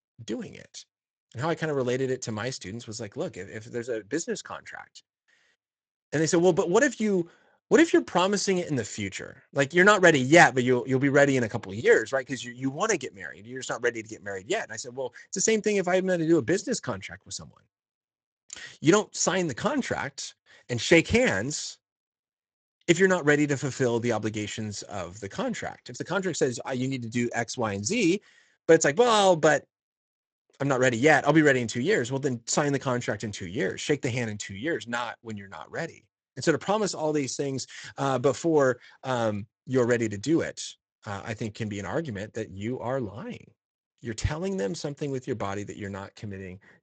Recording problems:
garbled, watery; slightly; nothing above 7.5 kHz

